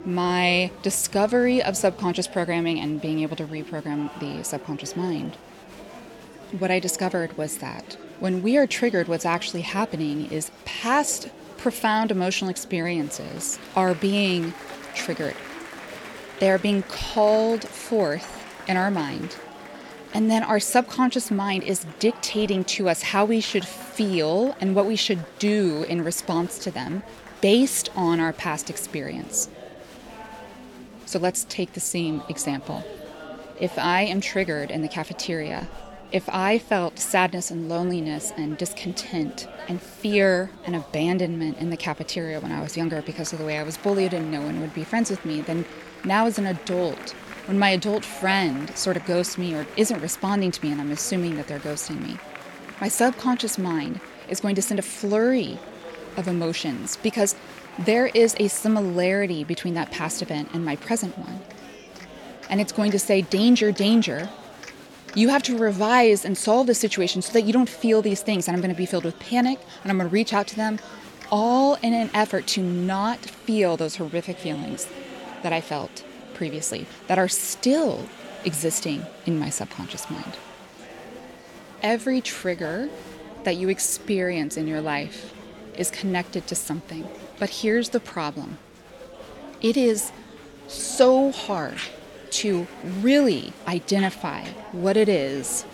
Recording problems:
murmuring crowd; noticeable; throughout; 15 dB below the speech

